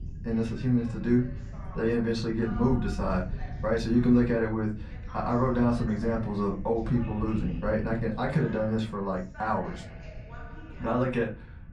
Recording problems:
off-mic speech; far
room echo; very slight; dies away in 0.3 s
voice in the background; faint; throughout; 20 dB below the speech
low rumble; faint; throughout; 25 dB below the speech

